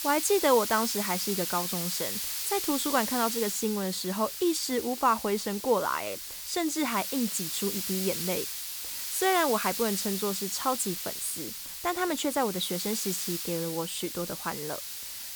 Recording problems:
hiss; loud; throughout; 3 dB below the speech

